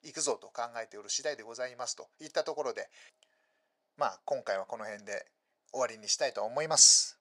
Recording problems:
thin; very; fading below 550 Hz

